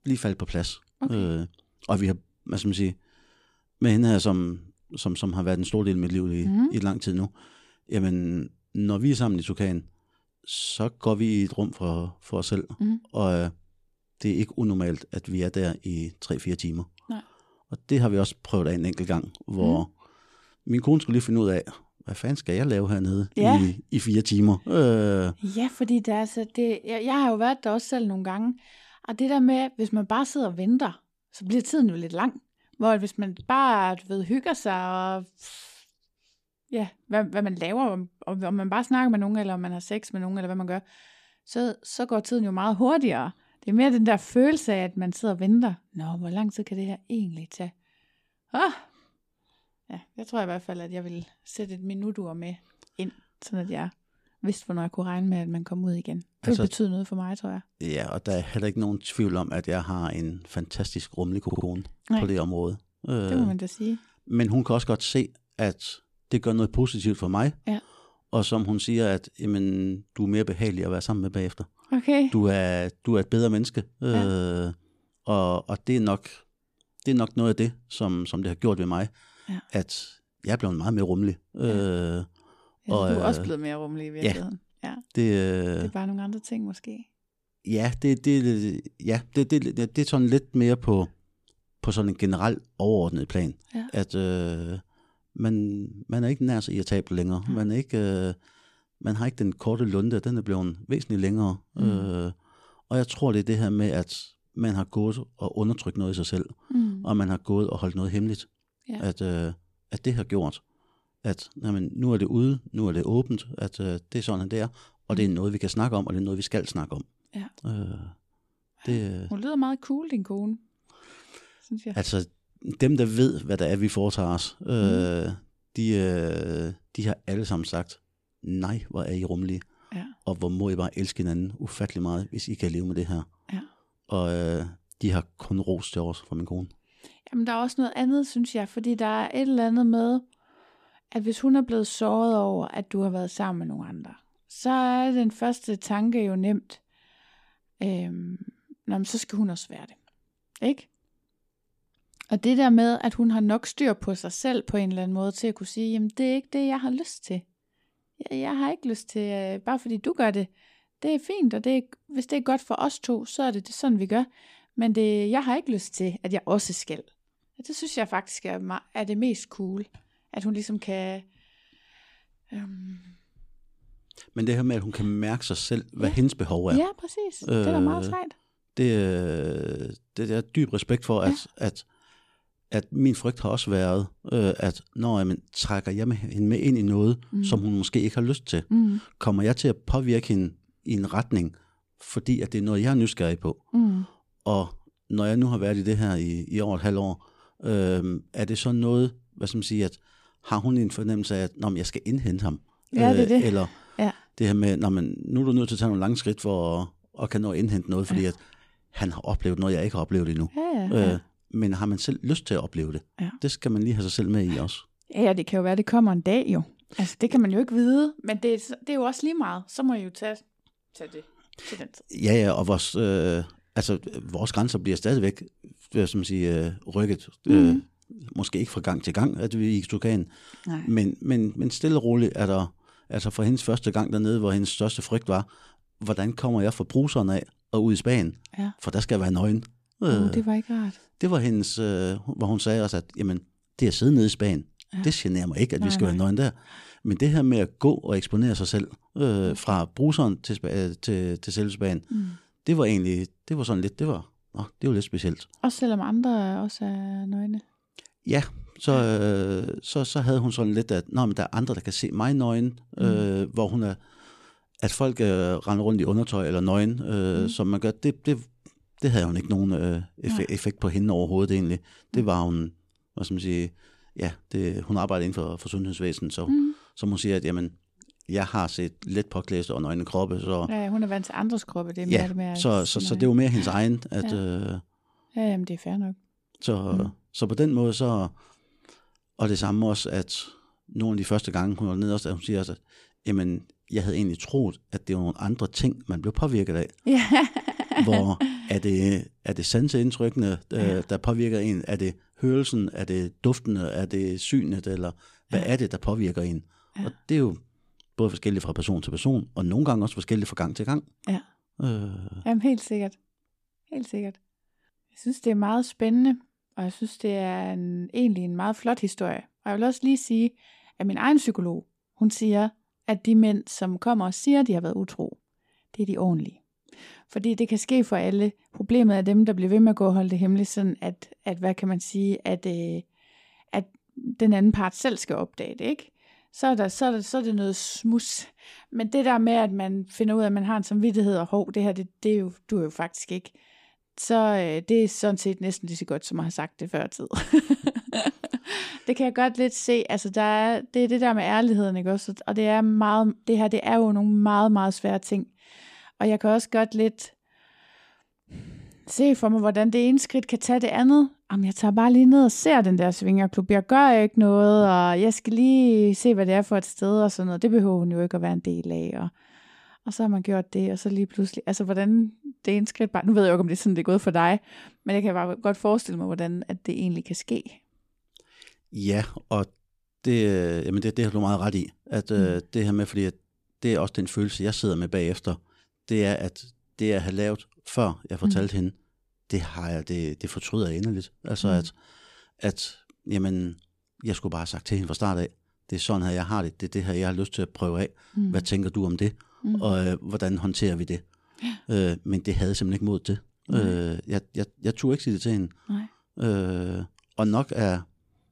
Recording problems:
audio stuttering; at 1:01 and at 4:57

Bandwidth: 14.5 kHz